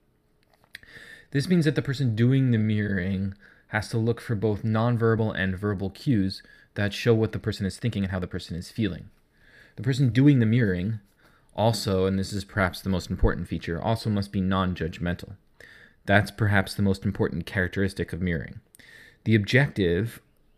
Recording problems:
uneven, jittery; strongly; from 1 to 17 s

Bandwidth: 15 kHz